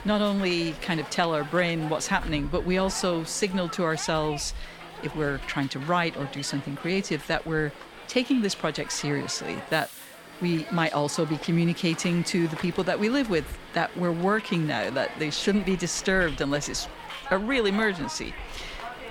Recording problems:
hiss; noticeable; throughout; 15 dB below the speech

